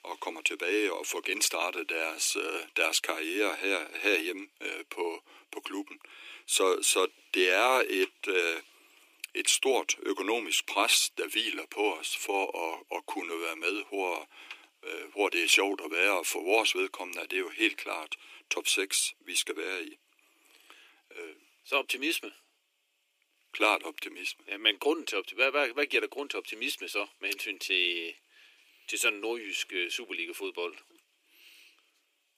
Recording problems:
thin; very; fading below 300 Hz

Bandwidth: 15 kHz